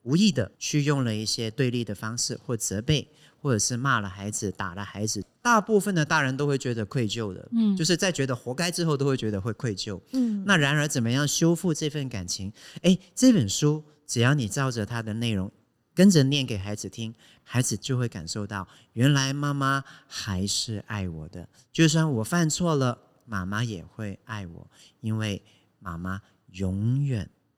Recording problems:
none

